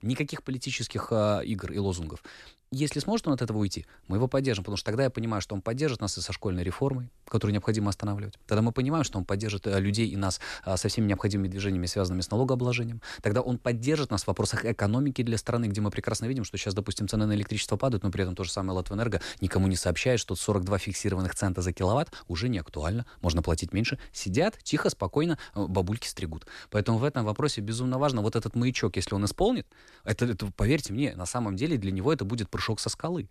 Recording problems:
none

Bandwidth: 13.5 kHz